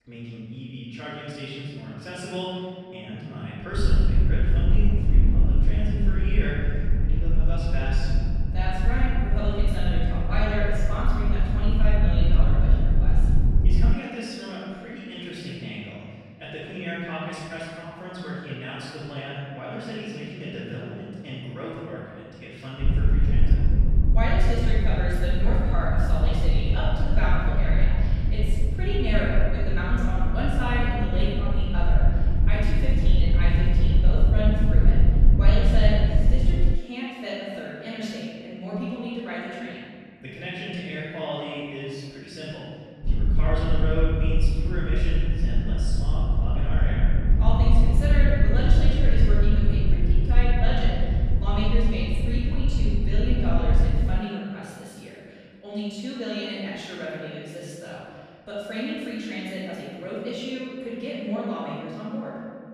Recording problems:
room echo; strong; dies away in 1.8 s
off-mic speech; far
low rumble; loud; from 4 to 14 s, from 23 to 37 s and from 43 to 54 s; 6 dB below the speech

